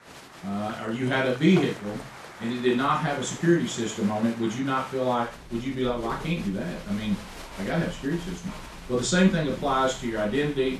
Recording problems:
off-mic speech; far
room echo; noticeable; dies away in 0.3 s
crowd noise; noticeable; throughout; 15 dB below the speech
household noises; noticeable; throughout; 20 dB below the speech

